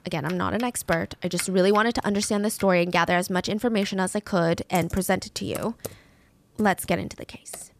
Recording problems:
household noises; noticeable; throughout; 20 dB below the speech

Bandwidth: 14.5 kHz